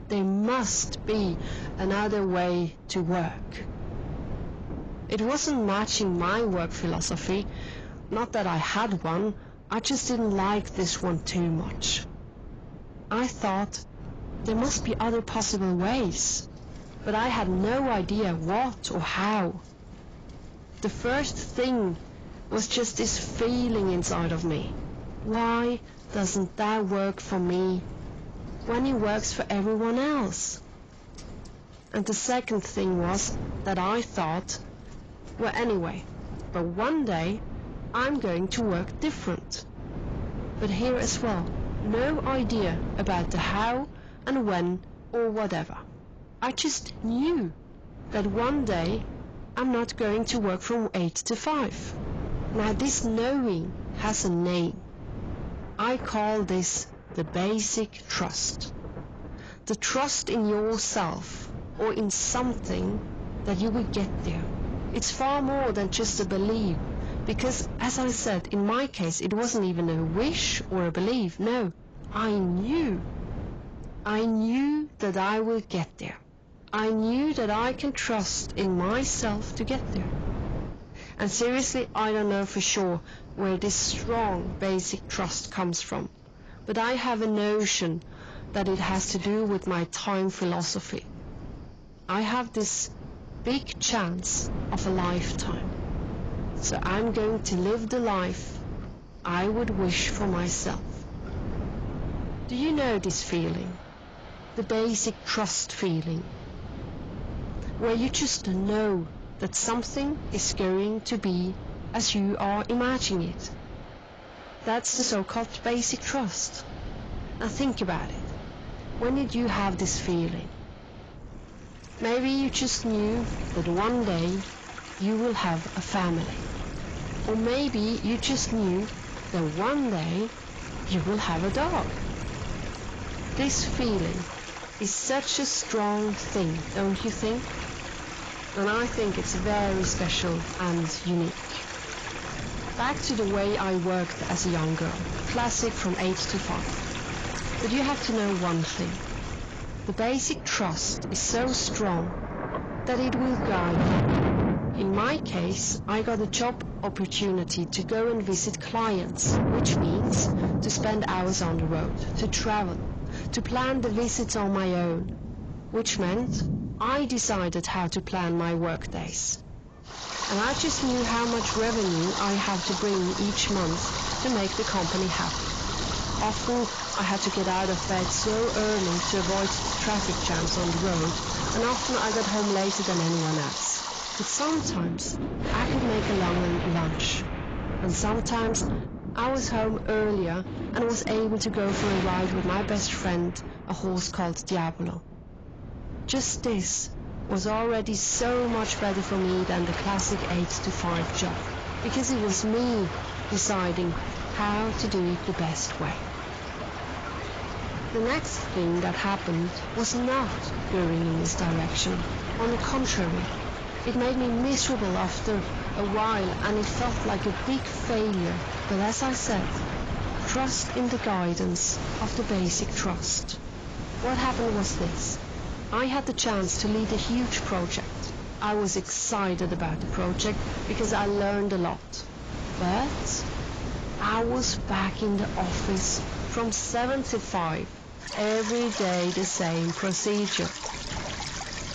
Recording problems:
distortion; heavy; 7 dB below the speech
garbled, watery; badly; nothing above 7.5 kHz
rain or running water; loud; throughout; 6 dB below the speech
wind noise on the microphone; occasional gusts; 15 dB below the speech

